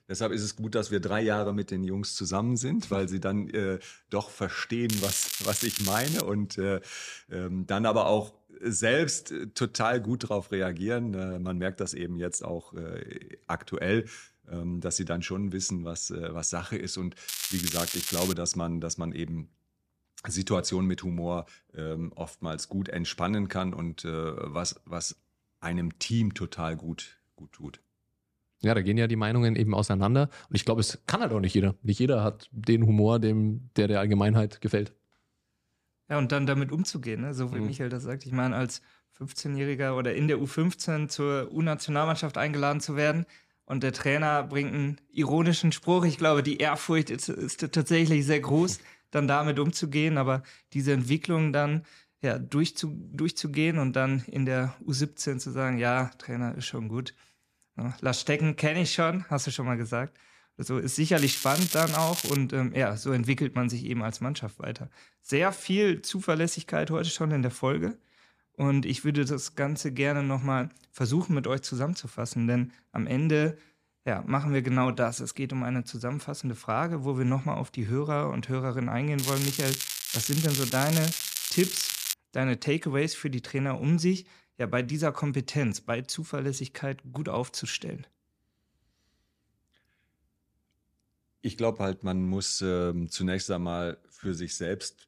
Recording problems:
crackling; loud; 4 times, first at 5 s; 2 dB below the speech

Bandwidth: 14.5 kHz